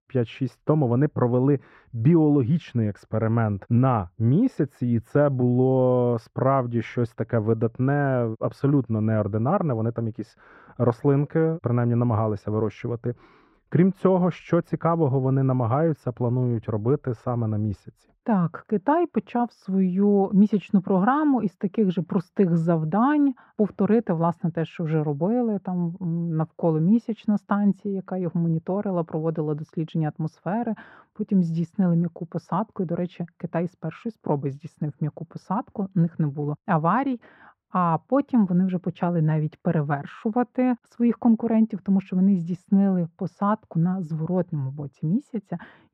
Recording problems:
muffled; very; fading above 3 kHz

